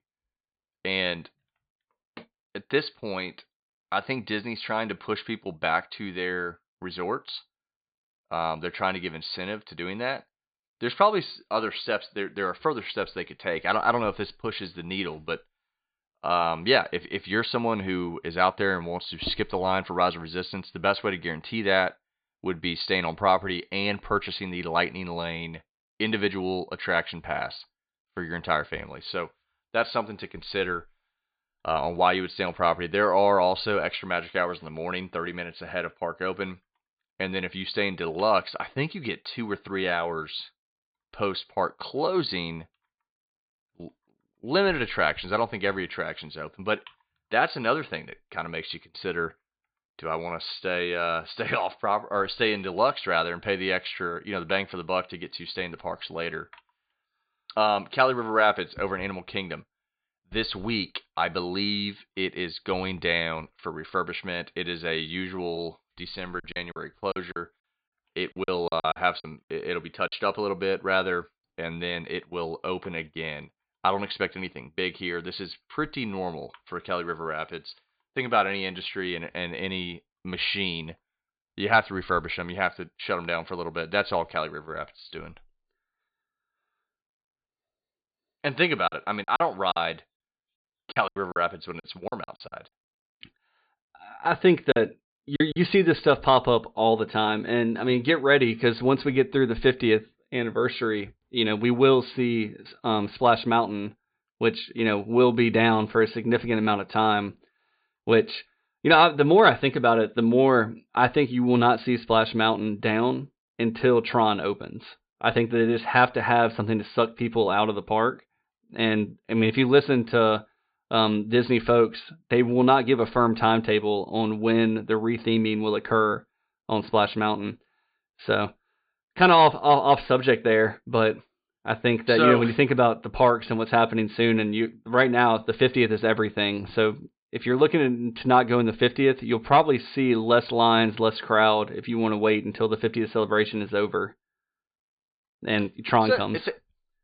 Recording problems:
high frequencies cut off; severe; nothing above 4.5 kHz
choppy; very; from 1:06 to 1:10, from 1:29 to 1:33 and at 1:35; 16% of the speech affected

